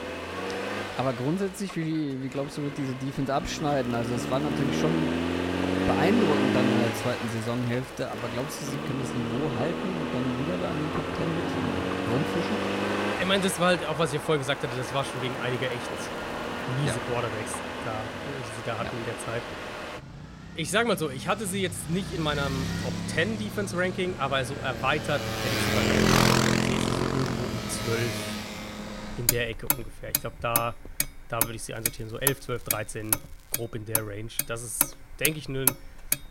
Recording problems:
traffic noise; very loud; throughout; 1 dB above the speech
crackling; faint; 4 times, first at 3.5 s; 25 dB below the speech

